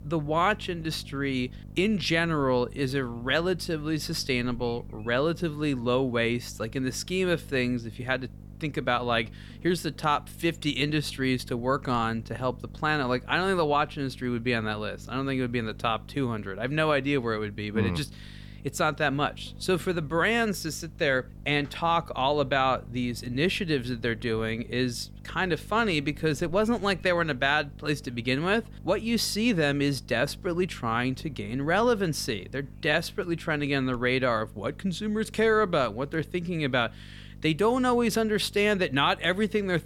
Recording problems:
electrical hum; faint; throughout; 50 Hz, 30 dB below the speech

